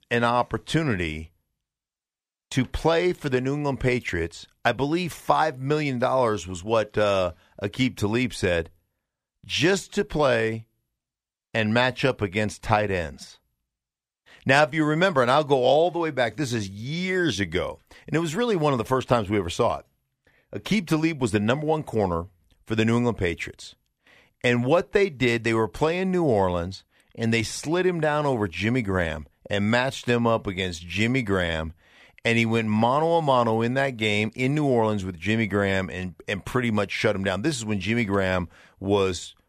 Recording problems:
none

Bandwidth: 14.5 kHz